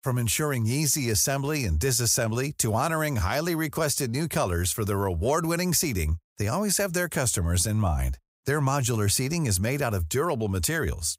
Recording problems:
none

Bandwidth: 15.5 kHz